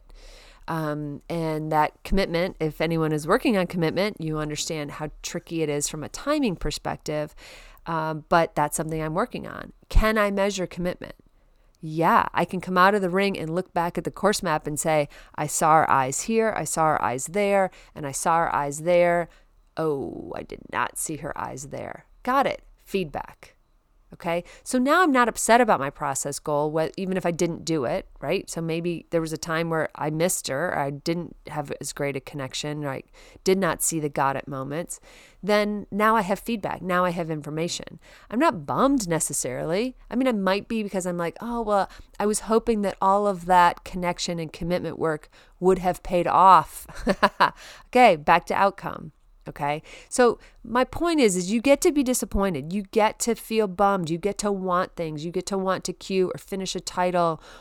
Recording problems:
none

